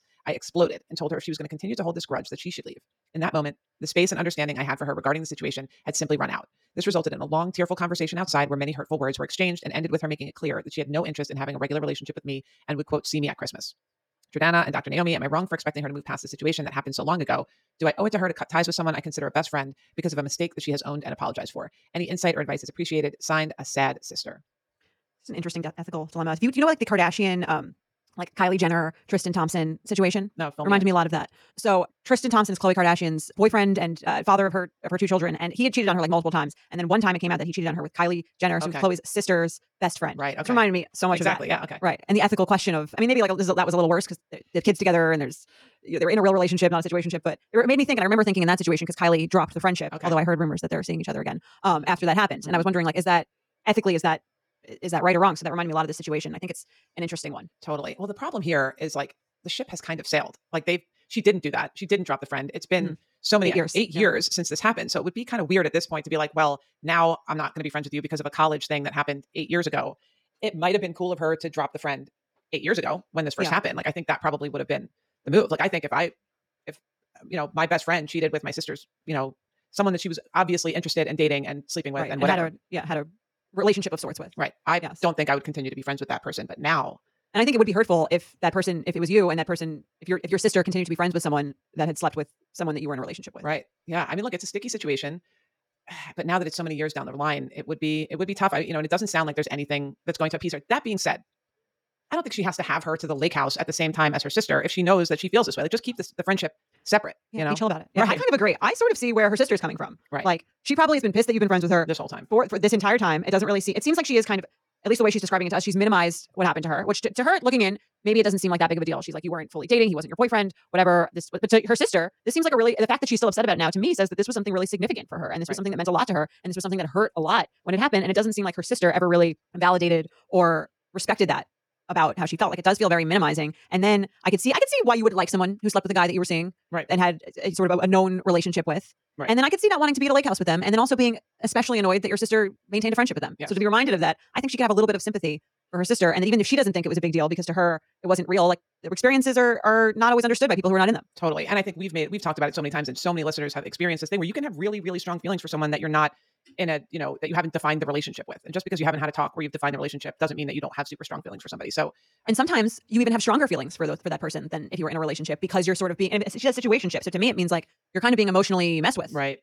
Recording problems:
wrong speed, natural pitch; too fast; 1.7 times normal speed

